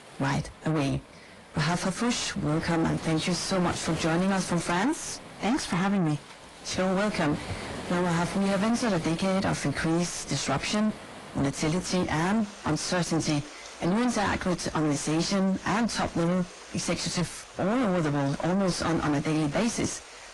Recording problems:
distortion; heavy; 5 dB below the speech
garbled, watery; slightly; nothing above 10.5 kHz
rain or running water; noticeable; throughout; 15 dB below the speech

